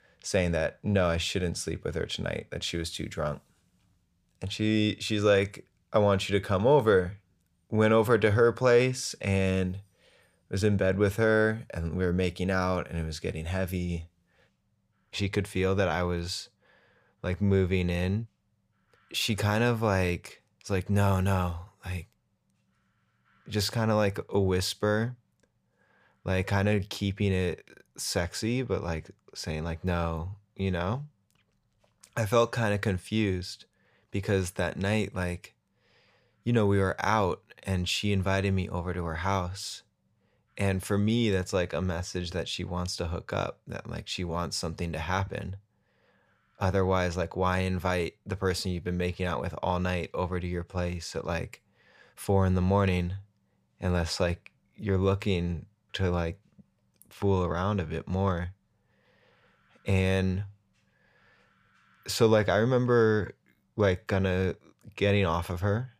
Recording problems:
none

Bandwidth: 15 kHz